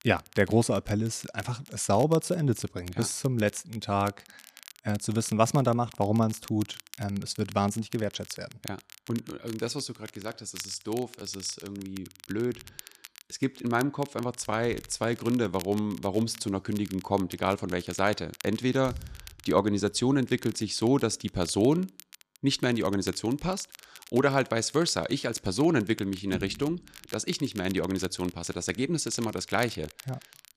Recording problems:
crackle, like an old record; noticeable; 20 dB below the speech

